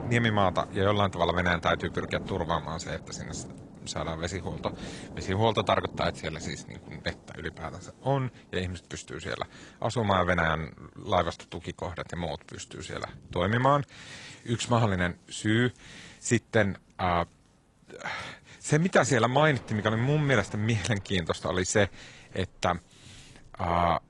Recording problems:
garbled, watery; slightly
rain or running water; noticeable; throughout; 15 dB below the speech

